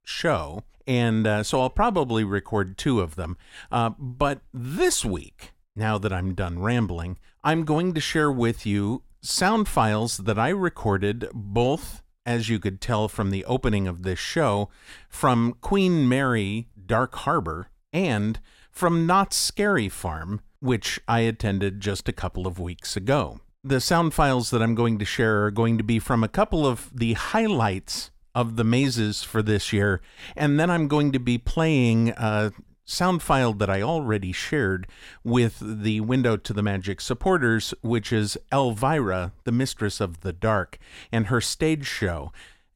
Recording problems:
none

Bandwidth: 16.5 kHz